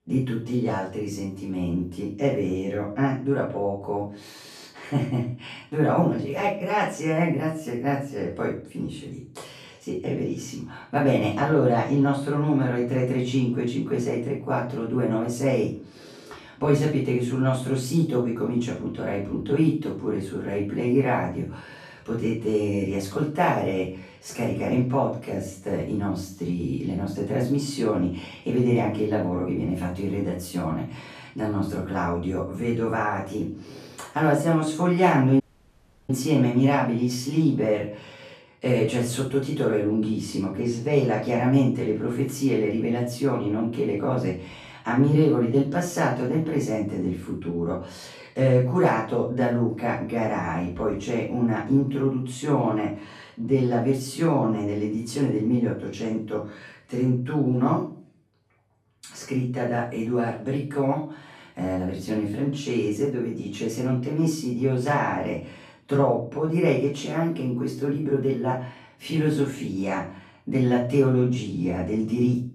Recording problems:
off-mic speech; far
room echo; noticeable; dies away in 0.4 s
audio cutting out; at 35 s for 0.5 s

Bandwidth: 13.5 kHz